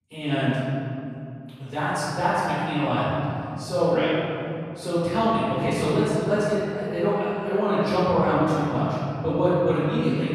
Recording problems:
room echo; strong; dies away in 2.8 s
off-mic speech; far

